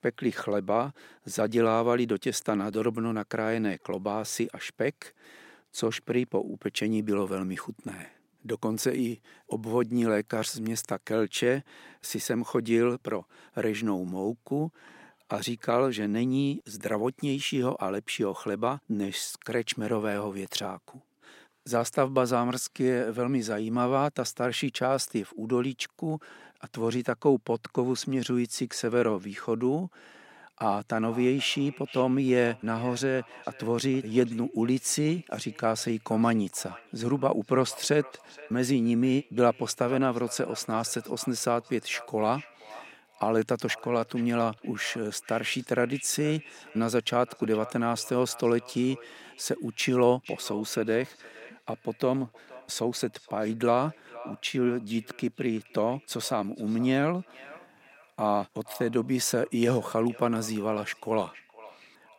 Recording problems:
echo of what is said; faint; from 31 s on; 470 ms later, 20 dB below the speech

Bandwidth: 16 kHz